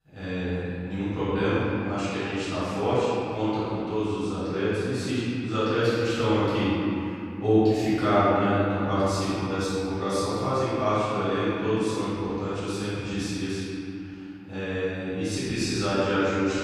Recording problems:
room echo; strong; dies away in 2.7 s
off-mic speech; far

